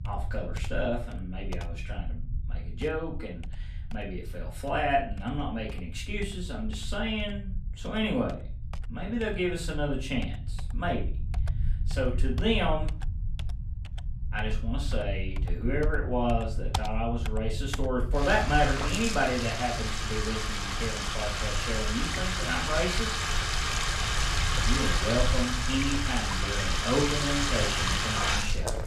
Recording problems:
off-mic speech; far
room echo; slight; dies away in 0.3 s
household noises; very loud; throughout; as loud as the speech
low rumble; faint; throughout; 20 dB below the speech

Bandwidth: 14.5 kHz